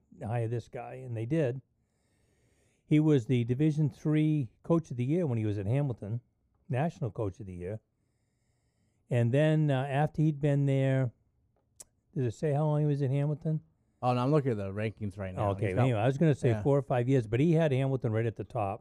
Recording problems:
muffled; slightly; fading above 1 kHz

